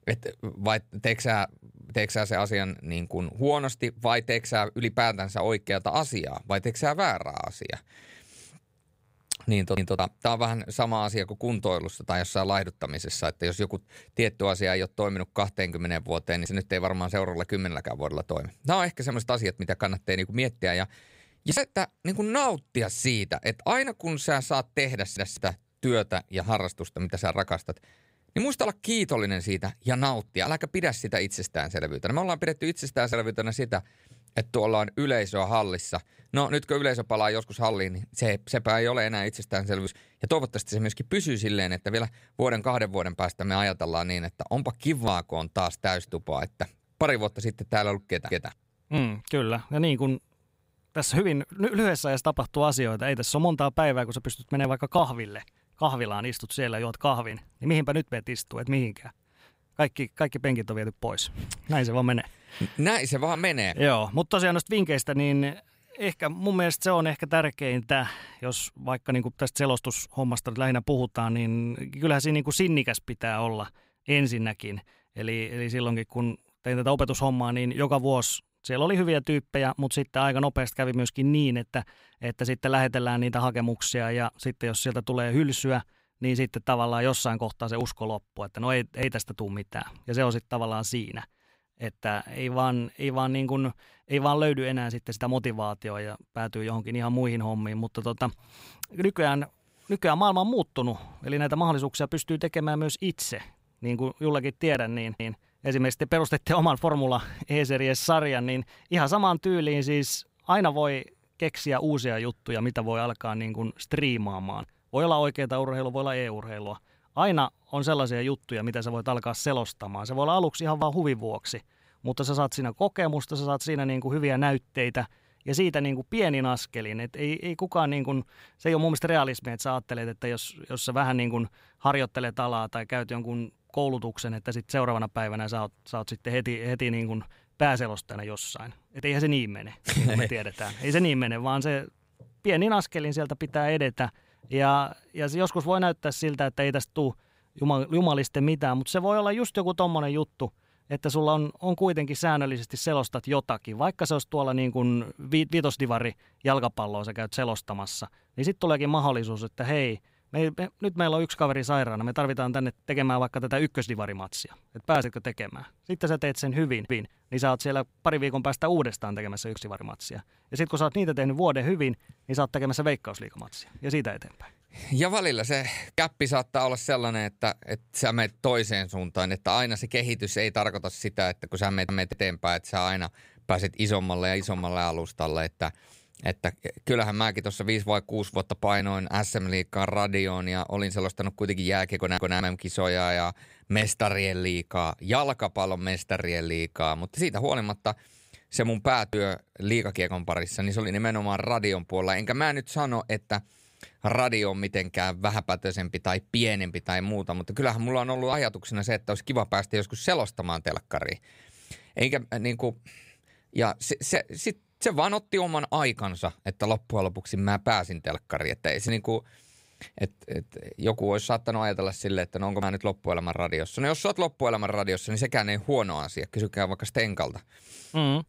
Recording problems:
none

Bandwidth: 15.5 kHz